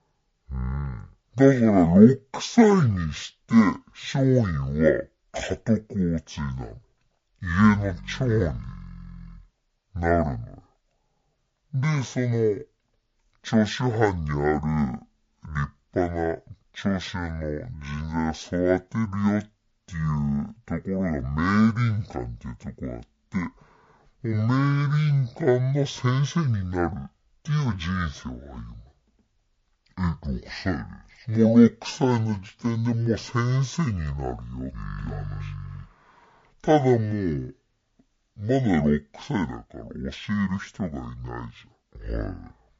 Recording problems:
wrong speed and pitch; too slow and too low; 0.5 times normal speed

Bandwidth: 7.5 kHz